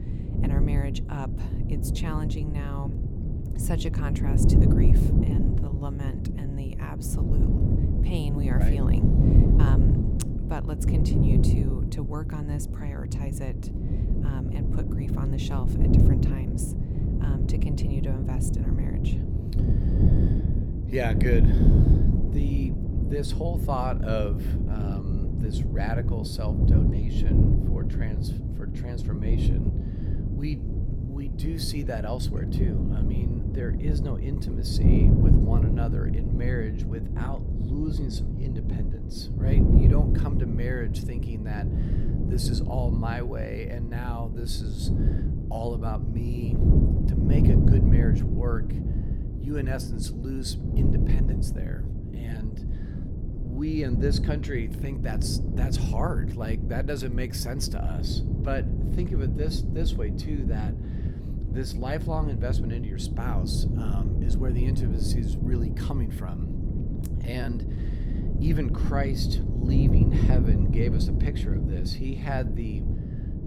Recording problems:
wind noise on the microphone; heavy; as loud as the speech
uneven, jittery; slightly; from 5 s to 1:08

